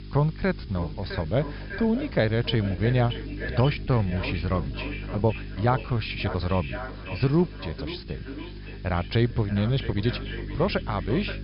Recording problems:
echo of what is said; noticeable; throughout; 570 ms later, 10 dB below the speech
high frequencies cut off; noticeable; nothing above 5.5 kHz
electrical hum; noticeable; throughout; 50 Hz, 20 dB below the speech
hiss; faint; throughout; 25 dB below the speech
uneven, jittery; strongly; from 0.5 to 11 s

